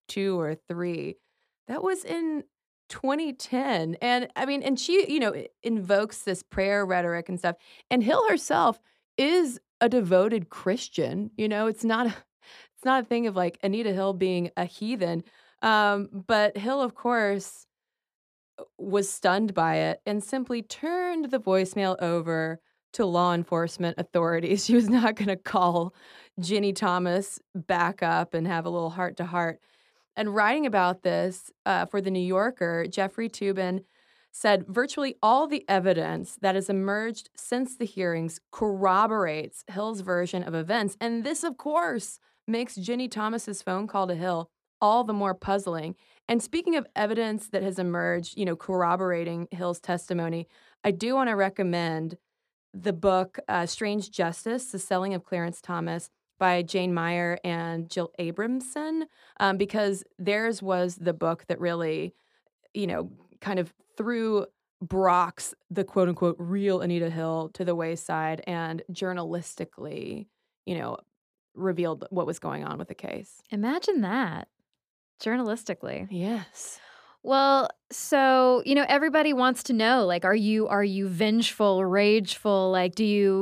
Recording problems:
abrupt cut into speech; at the end

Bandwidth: 14.5 kHz